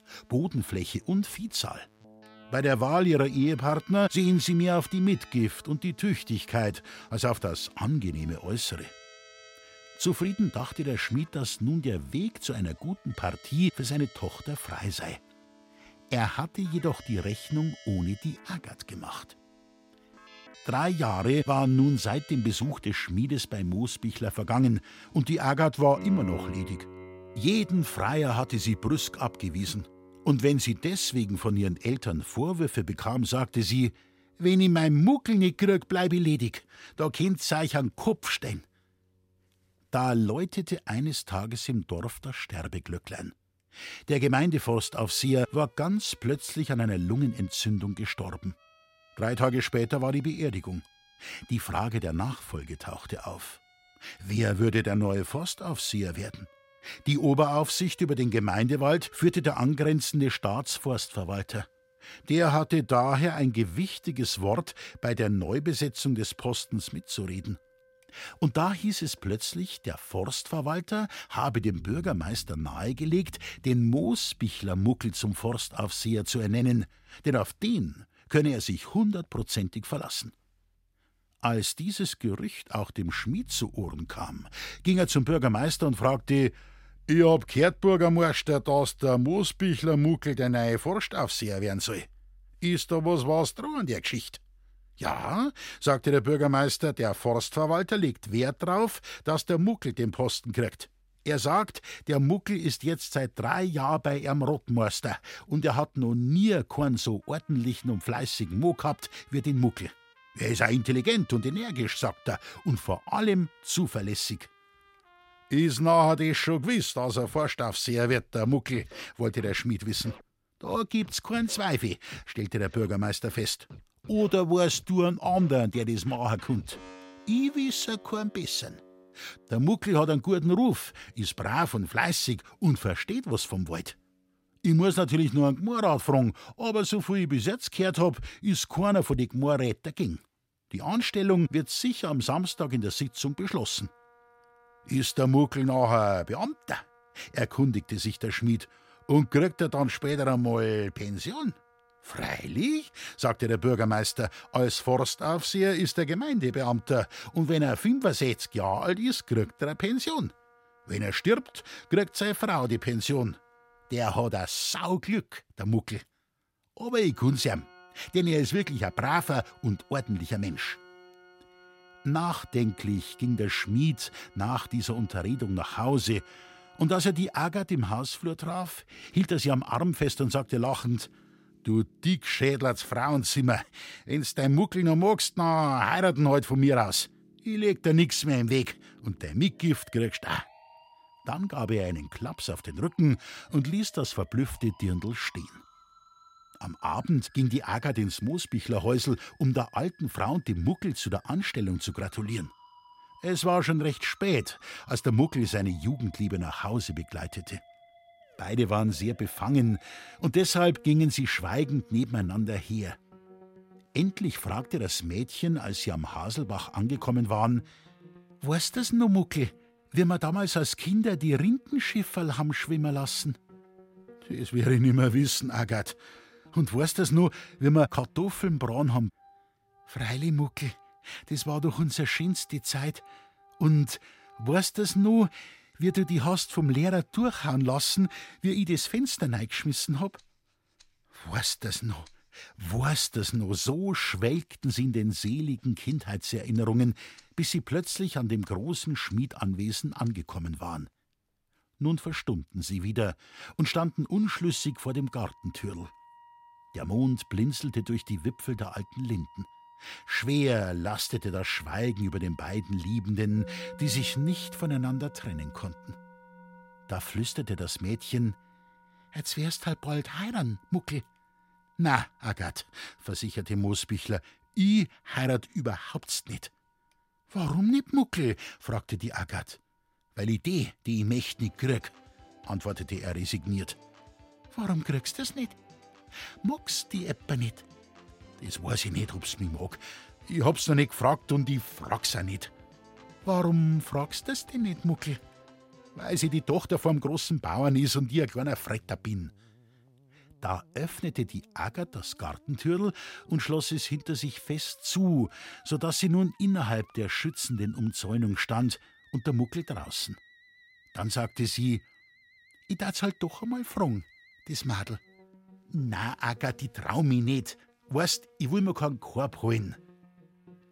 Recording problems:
background music; faint; throughout; 25 dB below the speech

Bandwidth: 16 kHz